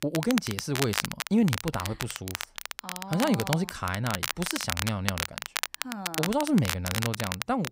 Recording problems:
crackle, like an old record; loud; 3 dB below the speech

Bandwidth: 15.5 kHz